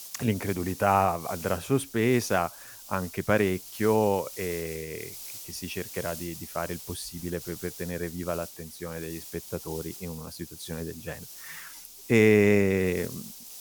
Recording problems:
hiss; noticeable; throughout; 15 dB below the speech

